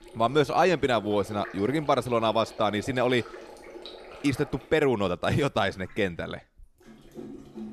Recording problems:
rain or running water; noticeable; throughout; 20 dB below the speech

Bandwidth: 13.5 kHz